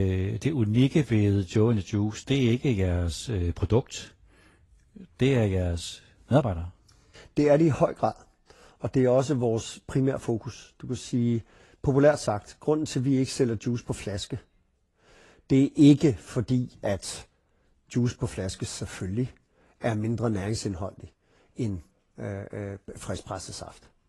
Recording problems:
garbled, watery; slightly
abrupt cut into speech; at the start

